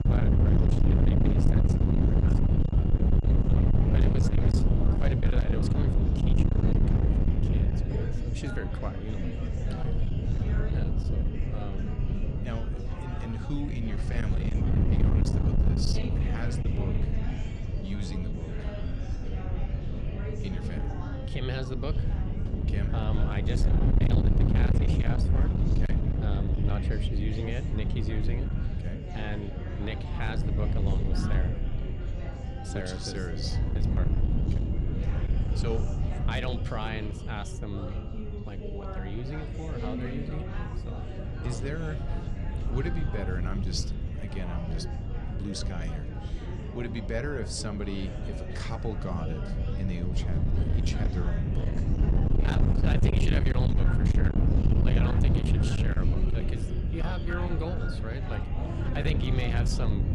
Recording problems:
distortion; heavy; 14% of the sound clipped
wind noise on the microphone; heavy; as loud as the speech
chatter from many people; loud; throughout; 6 dB below the speech
high-pitched whine; faint; throughout; 3 kHz, 25 dB below the speech

